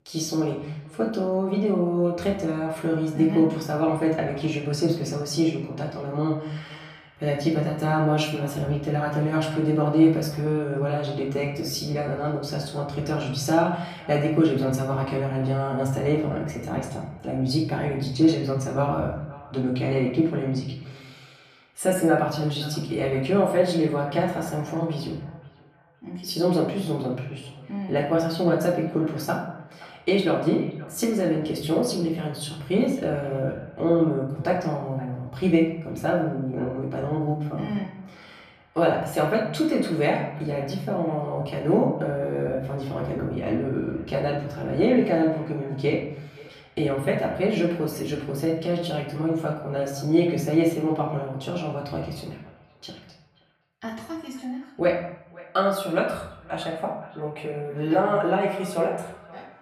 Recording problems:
off-mic speech; far
room echo; noticeable; dies away in 0.7 s
echo of what is said; faint; throughout; 520 ms later, 25 dB below the speech

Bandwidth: 14.5 kHz